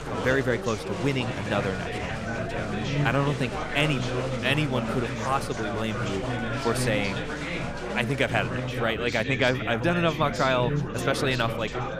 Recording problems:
chatter from many people; loud; throughout; 4 dB below the speech
electrical hum; faint; throughout; 60 Hz, 20 dB below the speech

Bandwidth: 14.5 kHz